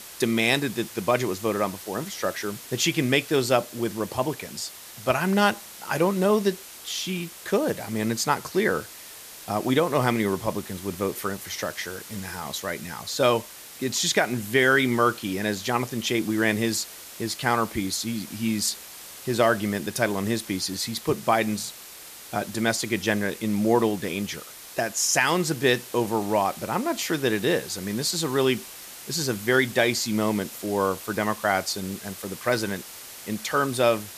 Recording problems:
hiss; noticeable; throughout; 15 dB below the speech

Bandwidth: 14.5 kHz